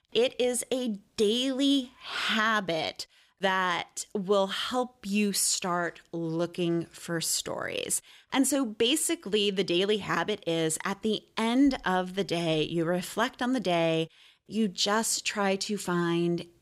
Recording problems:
none

